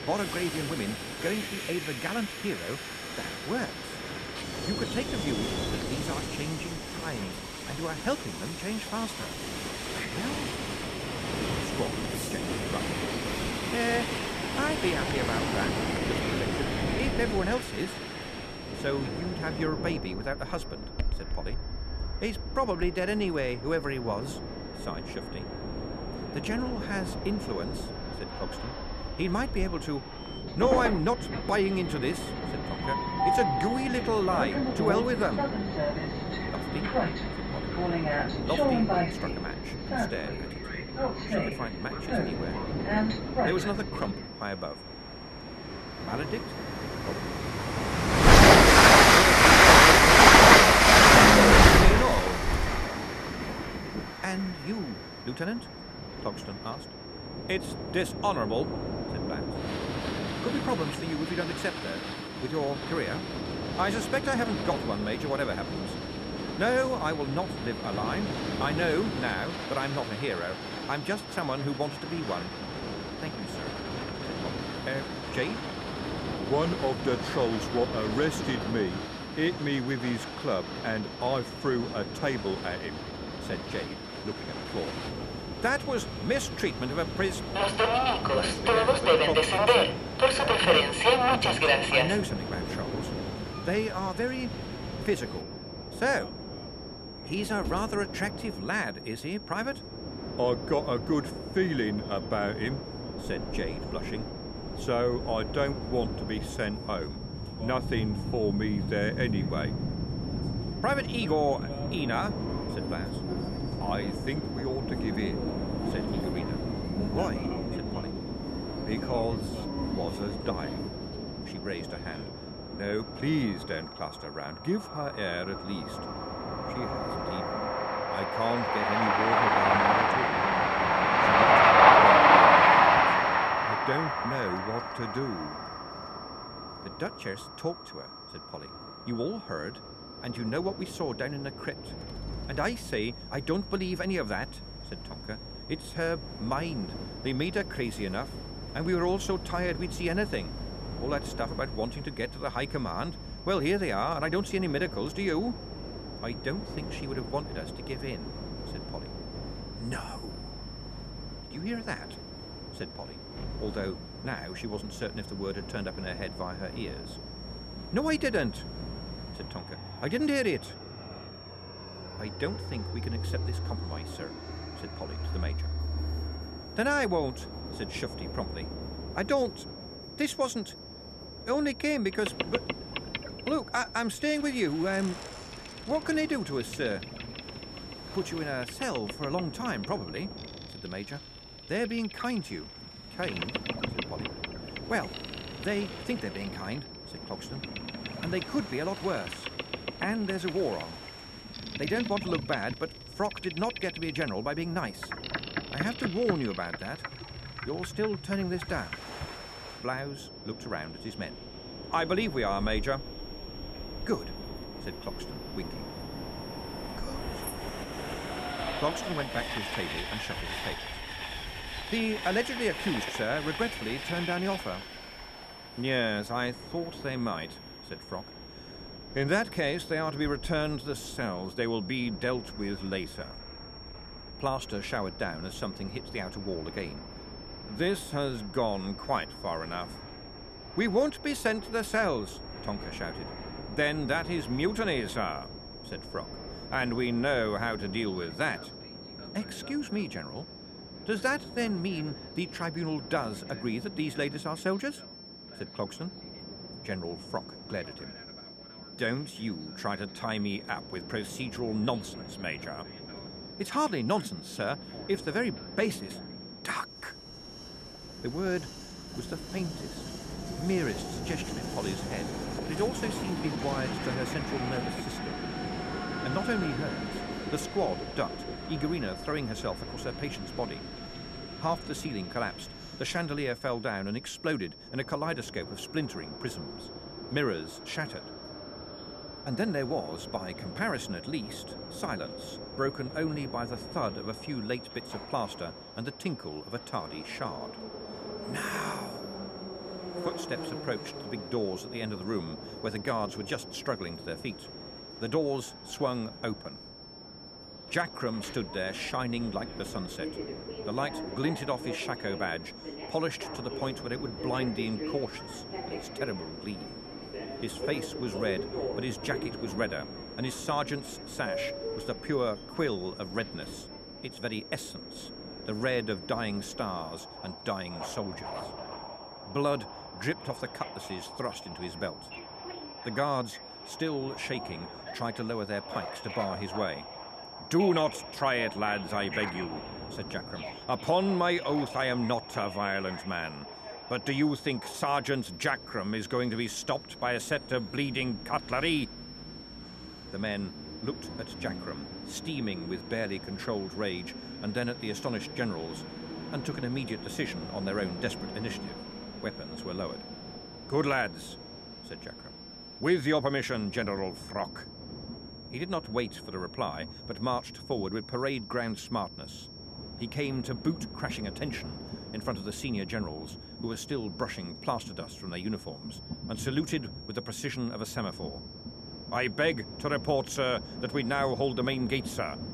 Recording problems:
train or aircraft noise; very loud; throughout; 5 dB above the speech
high-pitched whine; noticeable; throughout; 5.5 kHz, 15 dB below the speech

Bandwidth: 14 kHz